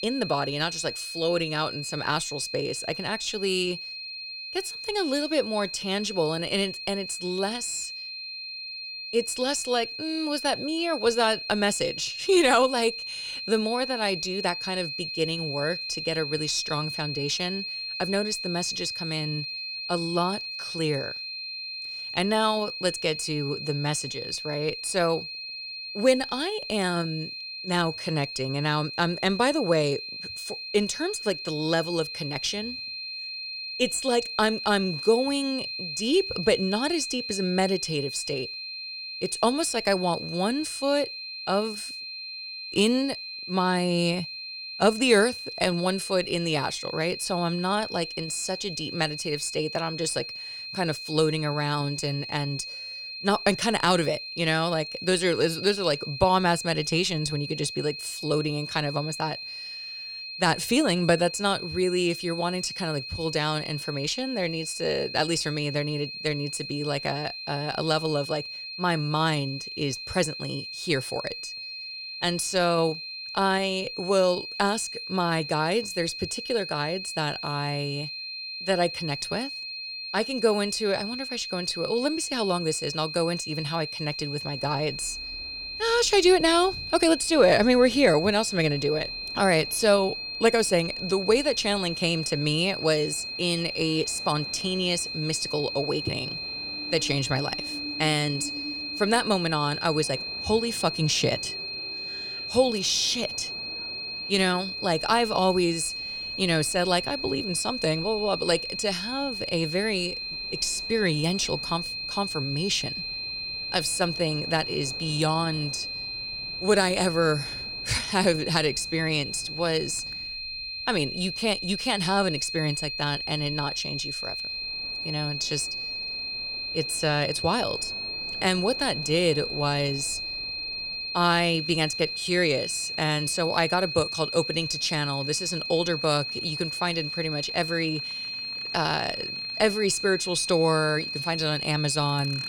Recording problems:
high-pitched whine; loud; throughout; 4 kHz, 6 dB below the speech
train or aircraft noise; faint; from 1:24 on; 25 dB below the speech

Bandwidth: 19 kHz